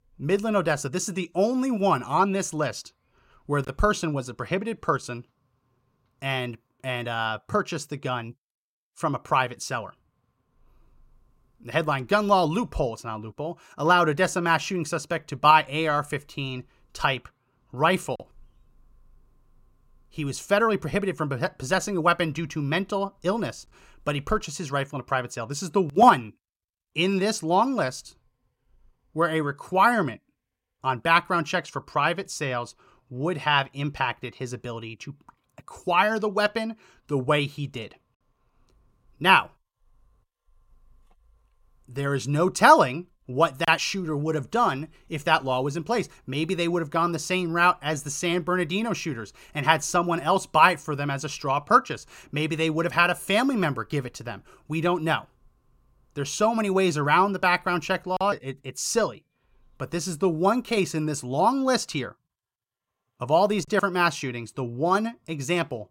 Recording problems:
none

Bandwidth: 16.5 kHz